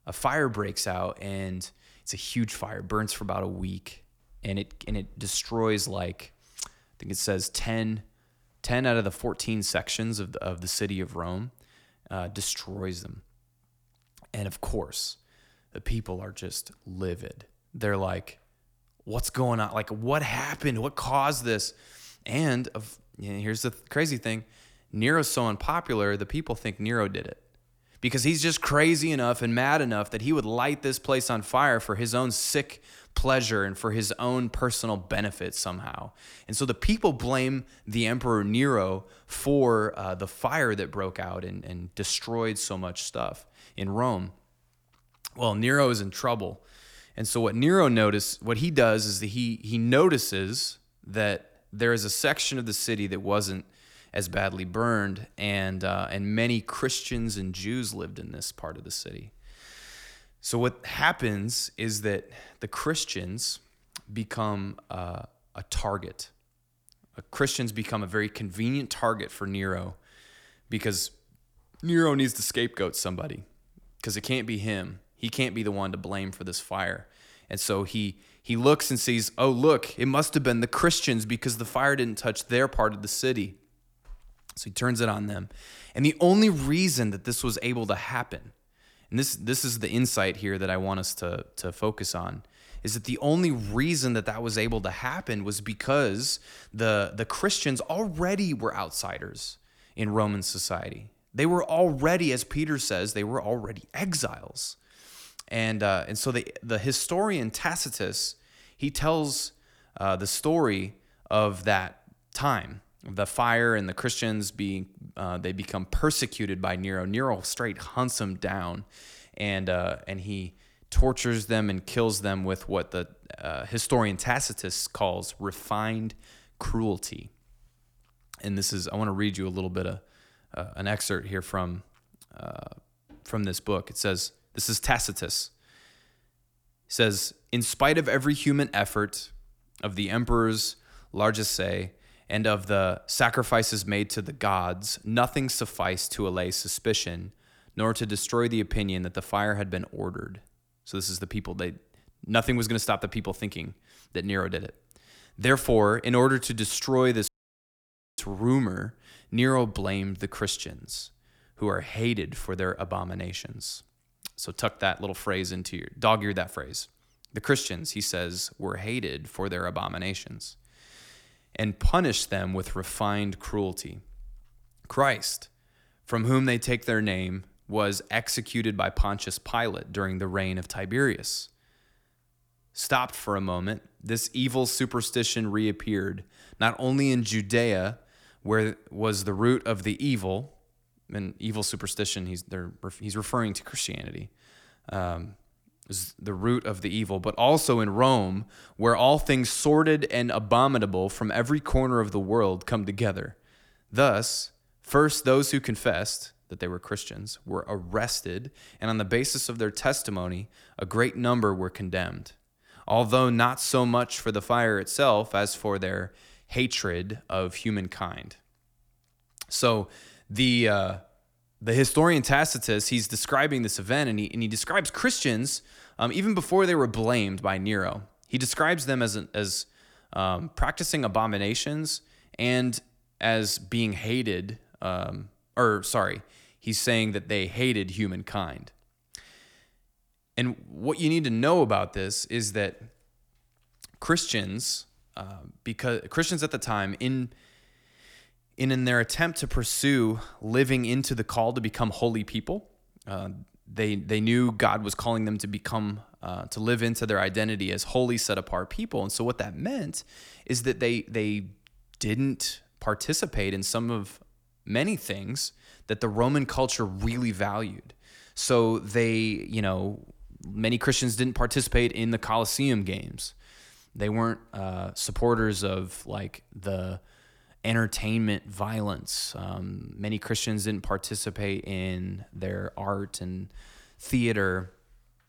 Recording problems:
audio cutting out; at 2:37 for 1 s

